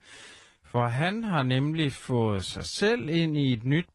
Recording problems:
wrong speed, natural pitch; too slow; 0.6 times normal speed
garbled, watery; slightly

